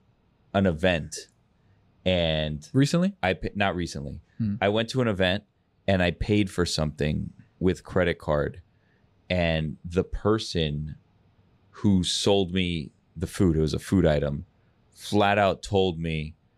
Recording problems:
none

